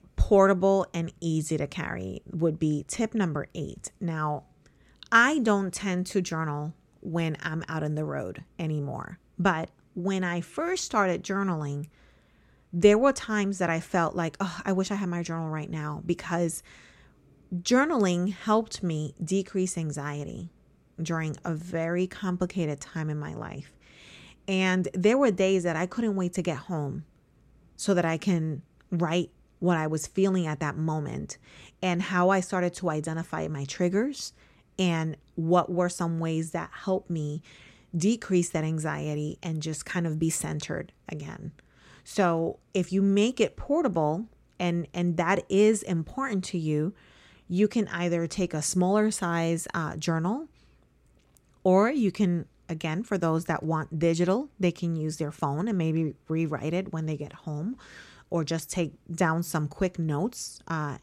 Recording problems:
none

